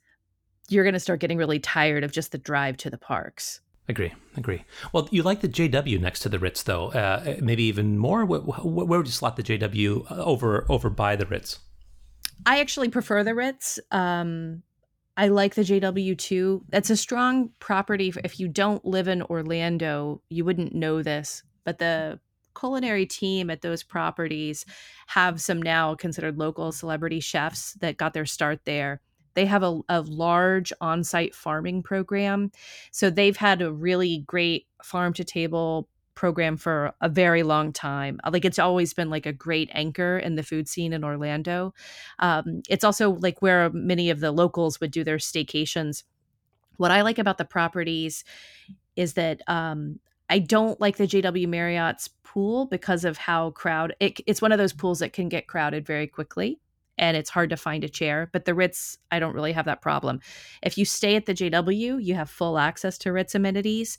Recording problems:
none

